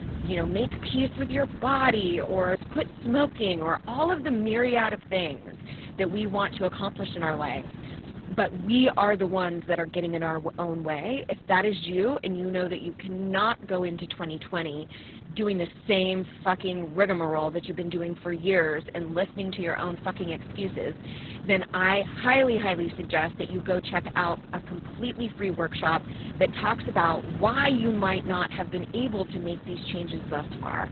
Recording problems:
garbled, watery; badly; nothing above 4 kHz
wind noise on the microphone; occasional gusts; 20 dB below the speech

